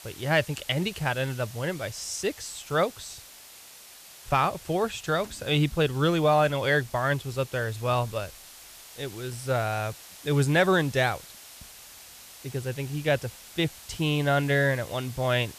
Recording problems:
hiss; noticeable; throughout; 20 dB below the speech

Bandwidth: 14.5 kHz